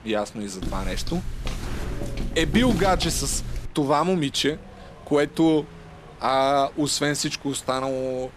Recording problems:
wind noise on the microphone; occasional gusts; 20 dB below the speech
footsteps; noticeable; from 0.5 to 3.5 s; peak 3 dB below the speech

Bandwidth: 14 kHz